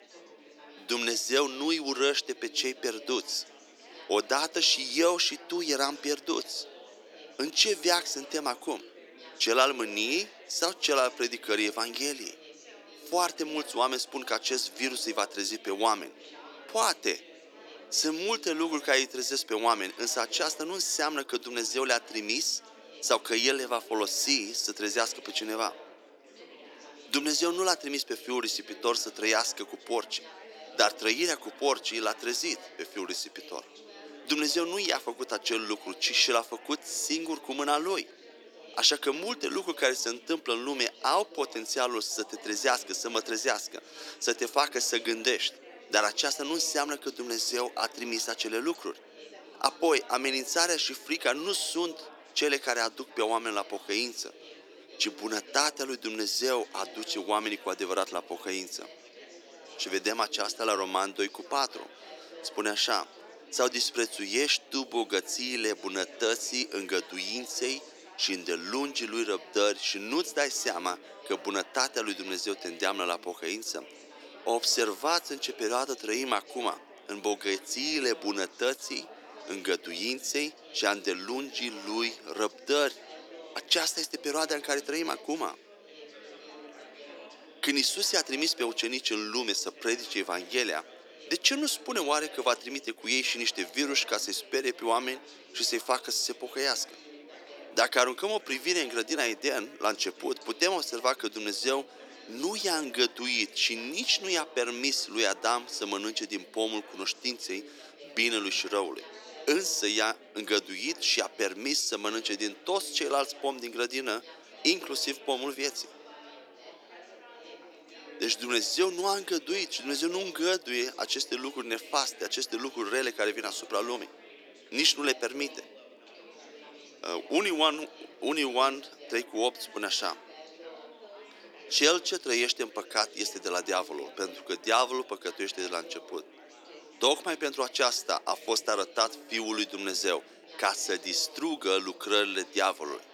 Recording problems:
thin; somewhat; fading below 300 Hz
chatter from many people; noticeable; throughout; 20 dB below the speech

